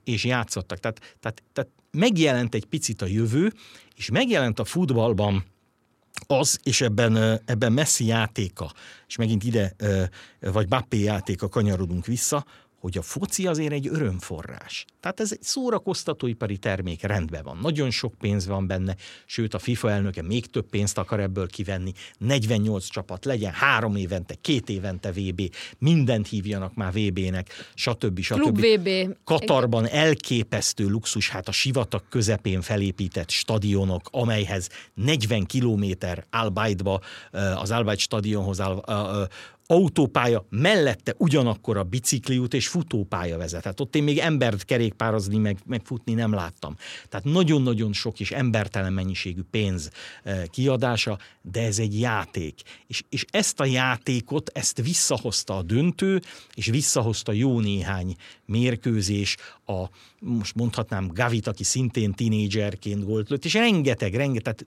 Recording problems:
none

